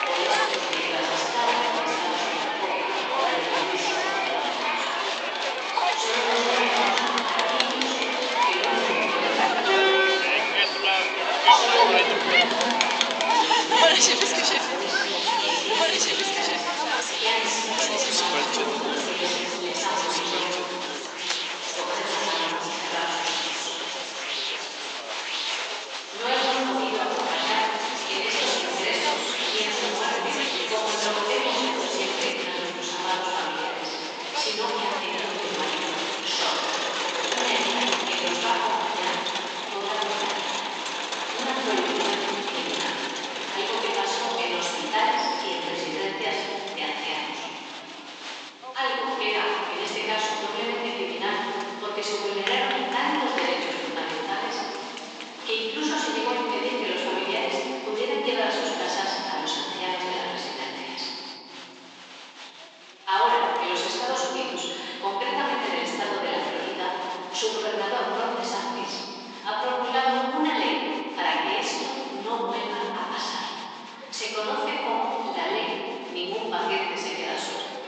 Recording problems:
room echo; strong; dies away in 3 s
off-mic speech; far
thin; somewhat; fading below 400 Hz
high frequencies cut off; noticeable; nothing above 8 kHz
crowd noise; very loud; throughout; 2 dB above the speech

